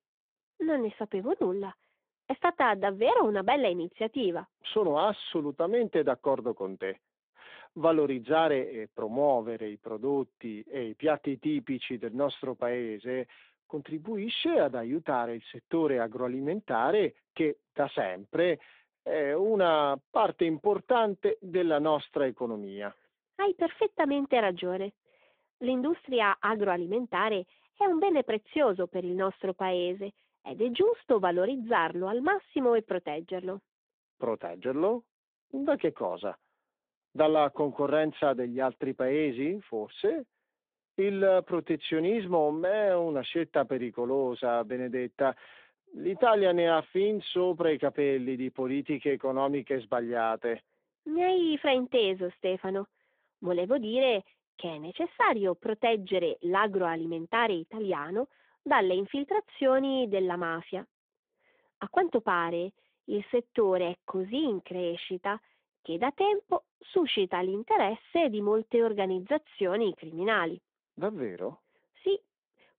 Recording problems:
phone-call audio

